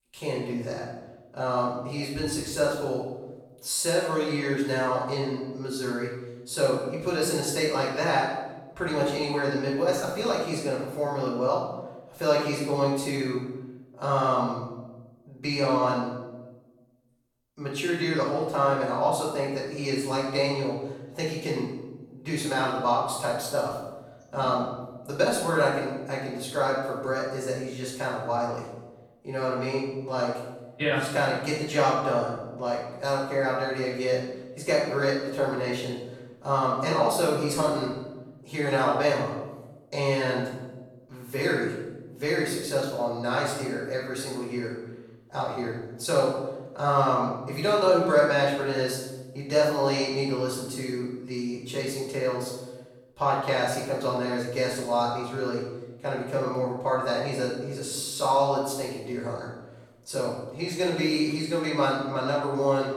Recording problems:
off-mic speech; far
room echo; noticeable; dies away in 1 s

